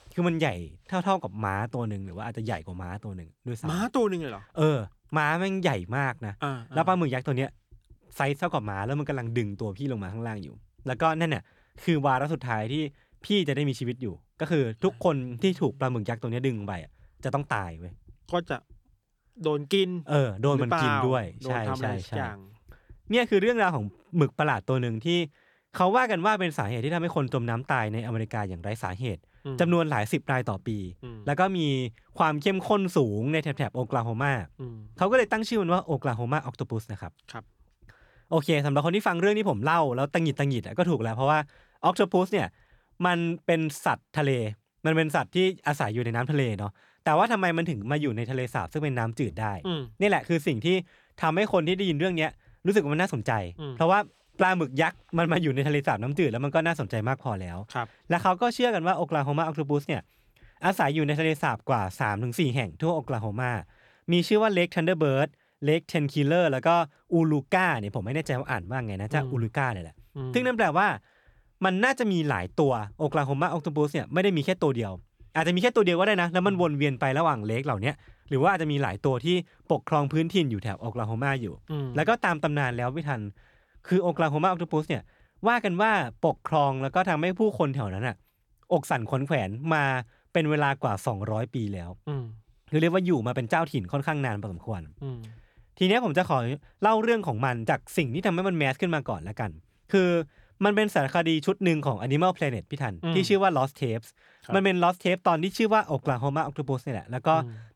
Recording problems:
none

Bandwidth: 18.5 kHz